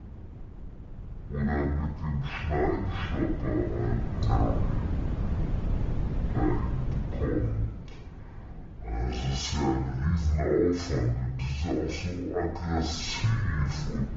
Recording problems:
off-mic speech; far
wrong speed and pitch; too slow and too low; 0.5 times normal speed
room echo; noticeable; dies away in 0.7 s
garbled, watery; slightly; nothing above 7.5 kHz
wind noise on the microphone; occasional gusts; 10 dB below the speech

